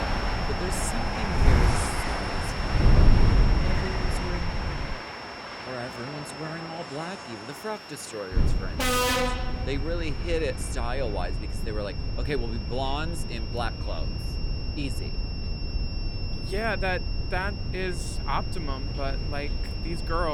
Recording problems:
train or aircraft noise; very loud; throughout; 2 dB above the speech
wind noise on the microphone; heavy; until 5 s and from 8.5 s on; 7 dB below the speech
high-pitched whine; loud; throughout; 5.5 kHz, 7 dB below the speech
abrupt cut into speech; at the end

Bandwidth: 18.5 kHz